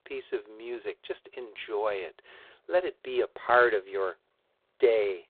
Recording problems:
phone-call audio; poor line; nothing above 4 kHz

